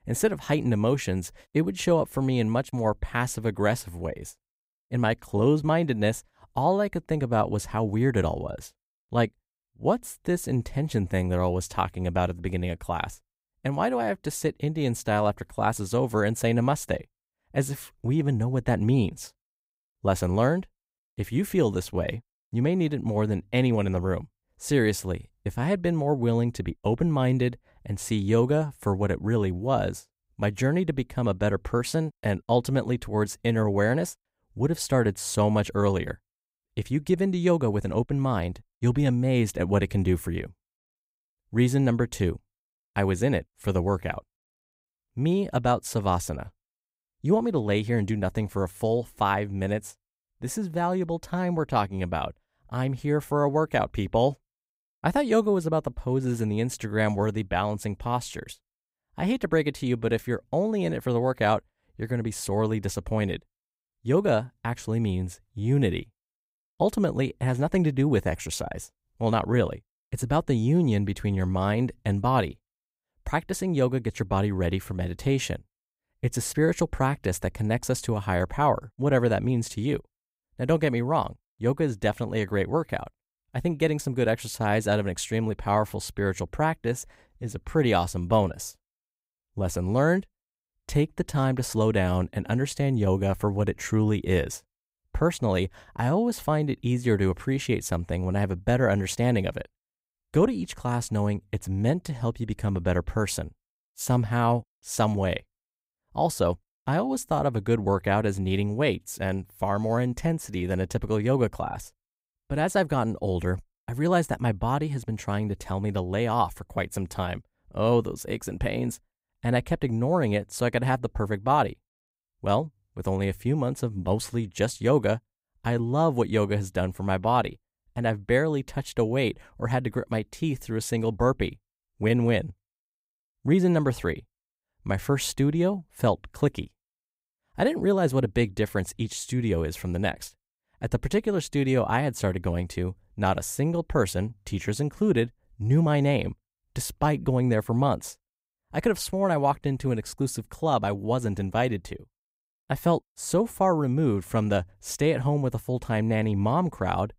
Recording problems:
none

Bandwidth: 15.5 kHz